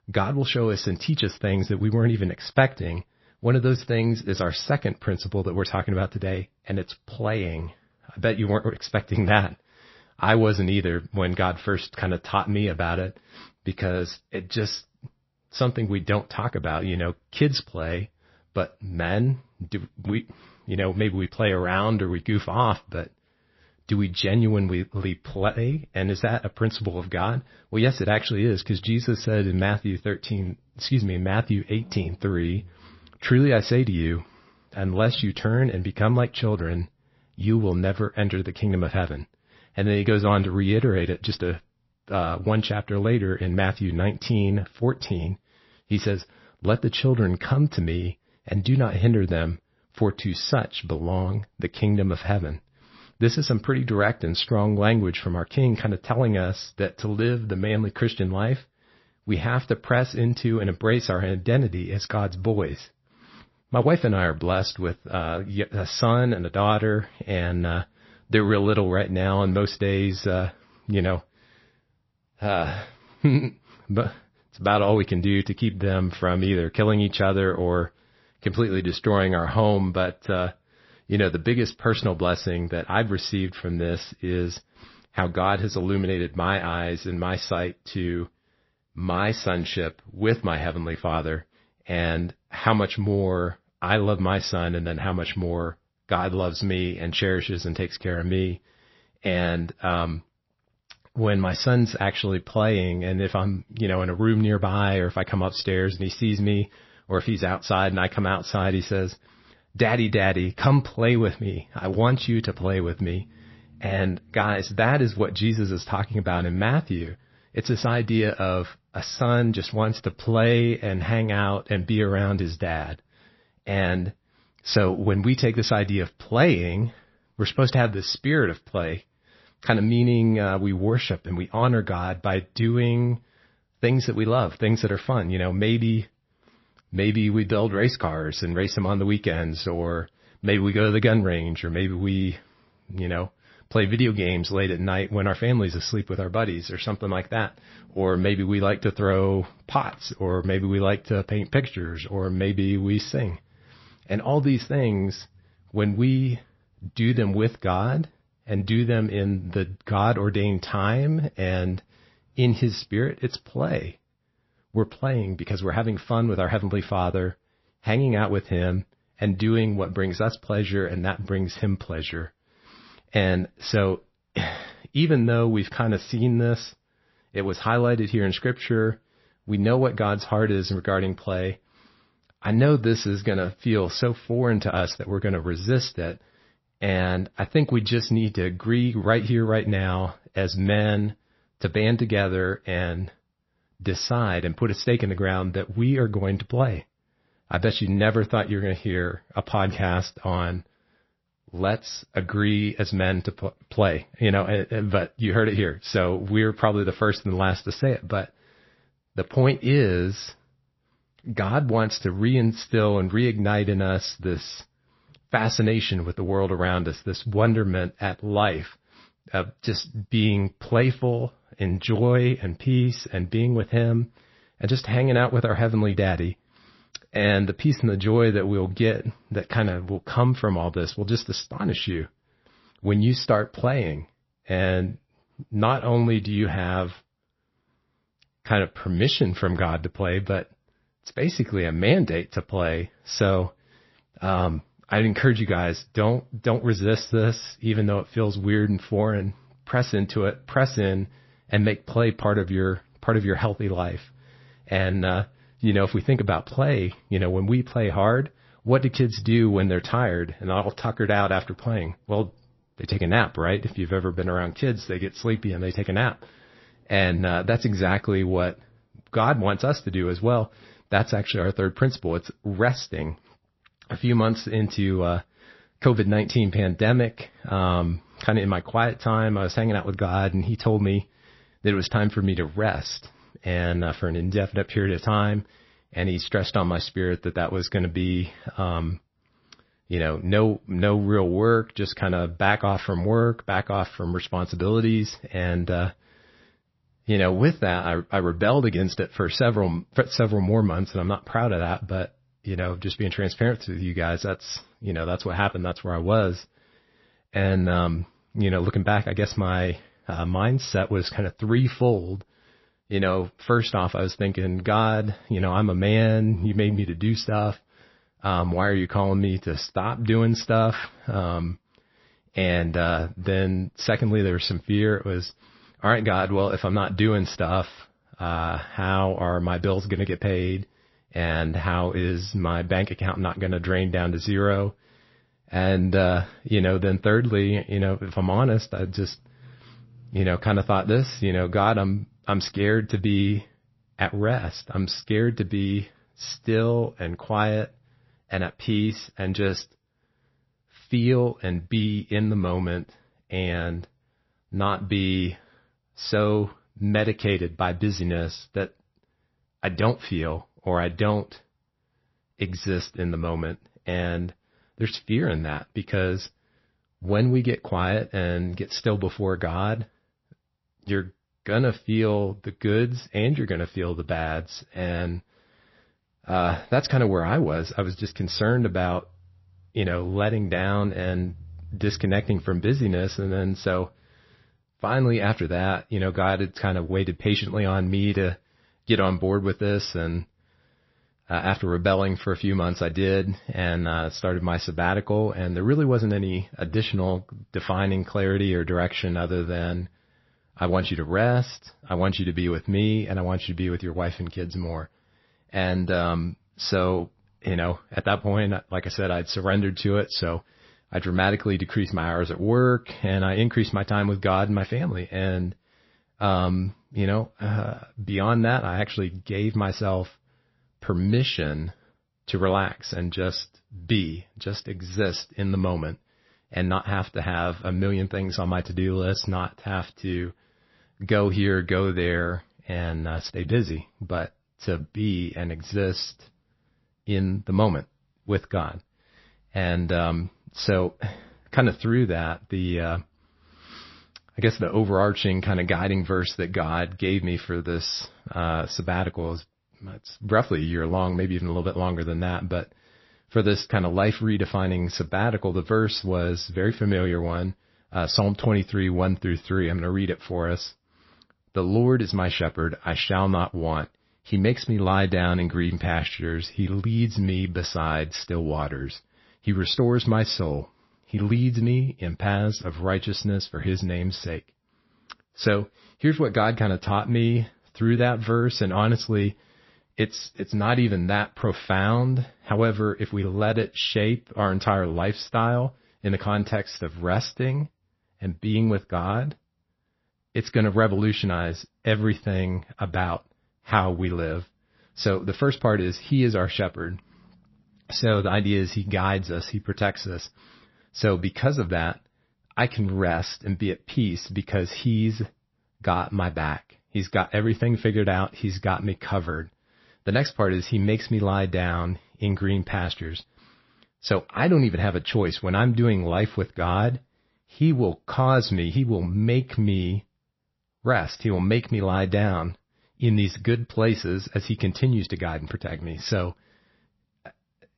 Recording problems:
garbled, watery; slightly; nothing above 5.5 kHz

